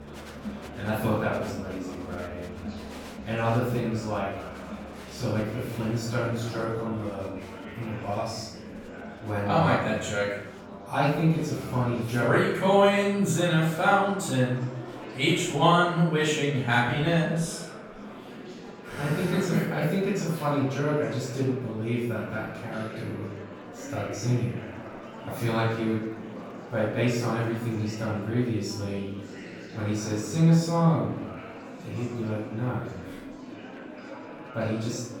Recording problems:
off-mic speech; far
room echo; noticeable; dies away in 0.7 s
murmuring crowd; noticeable; throughout; 15 dB below the speech
background music; faint; throughout; 20 dB below the speech

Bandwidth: 18 kHz